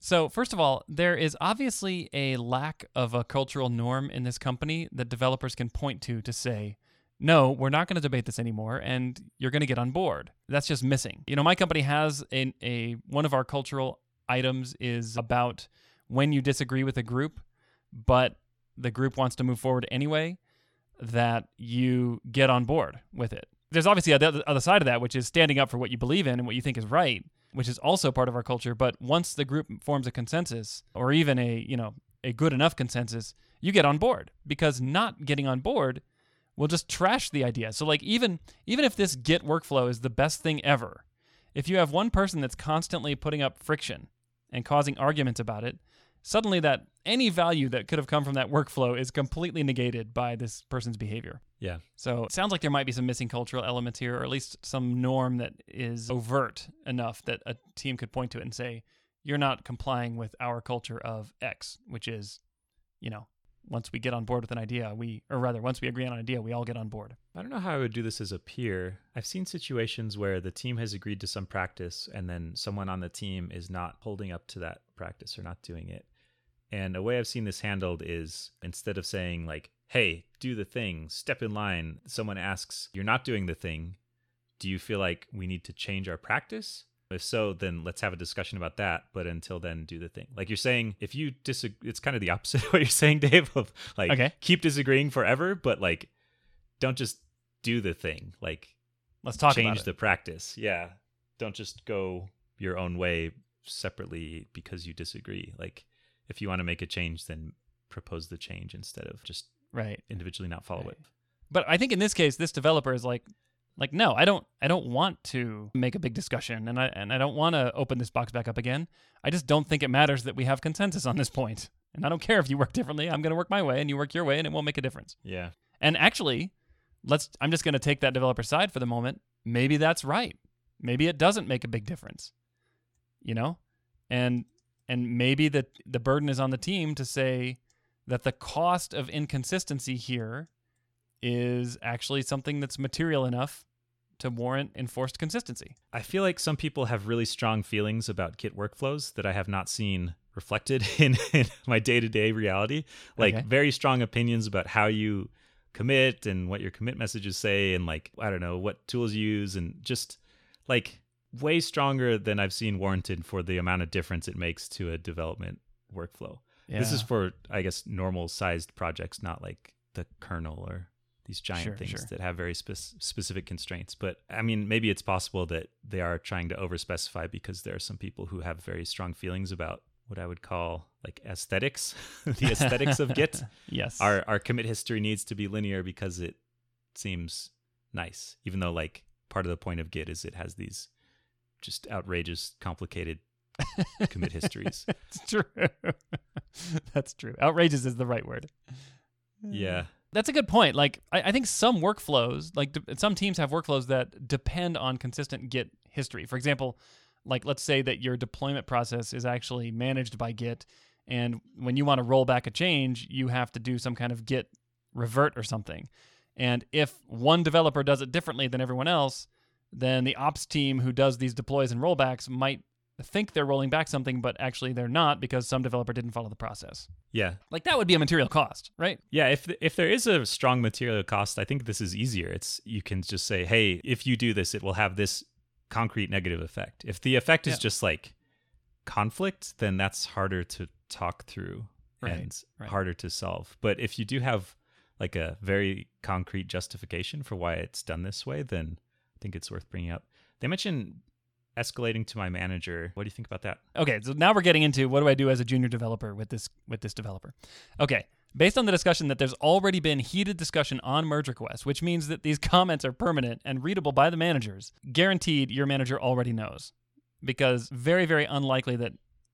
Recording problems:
none

